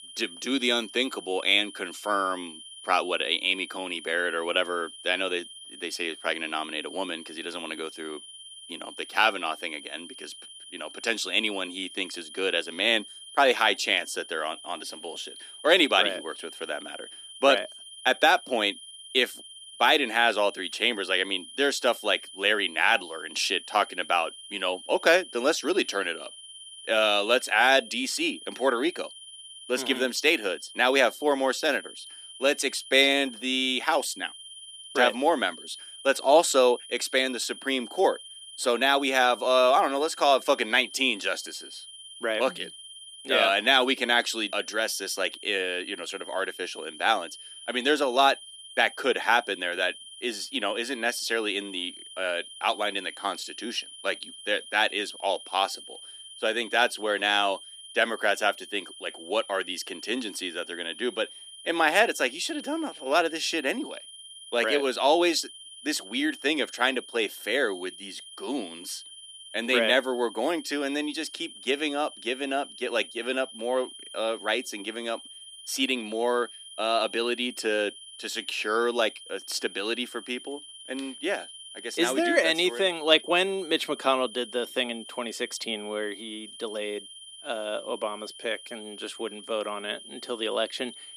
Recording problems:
thin; very slightly; fading below 250 Hz
high-pitched whine; noticeable; throughout; 3 kHz, 15 dB below the speech

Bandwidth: 14.5 kHz